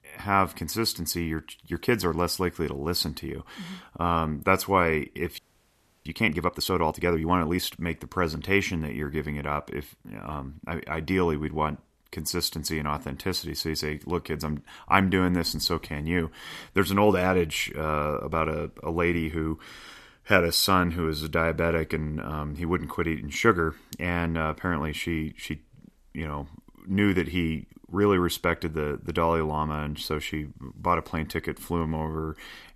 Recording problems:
audio freezing; at 5.5 s for 0.5 s

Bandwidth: 14 kHz